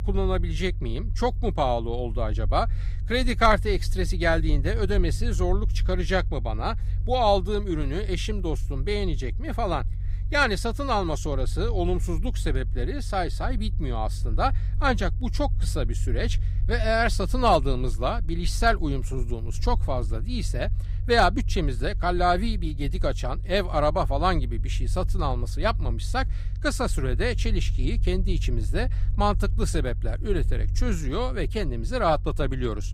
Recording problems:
low rumble; faint; throughout; 20 dB below the speech

